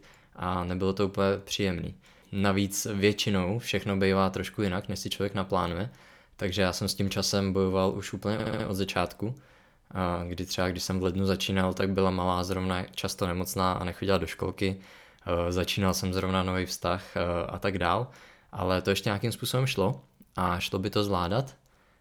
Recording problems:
audio stuttering; at 8.5 s

